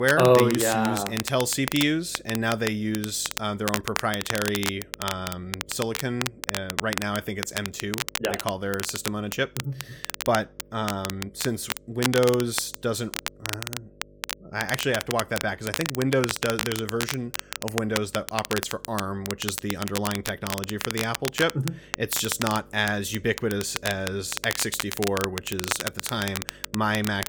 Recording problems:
crackle, like an old record; loud; 5 dB below the speech
electrical hum; faint; throughout; 50 Hz, 30 dB below the speech
abrupt cut into speech; at the start

